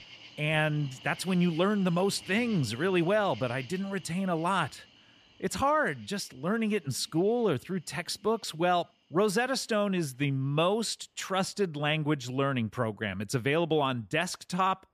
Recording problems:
animal sounds; faint; throughout; 20 dB below the speech

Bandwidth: 14.5 kHz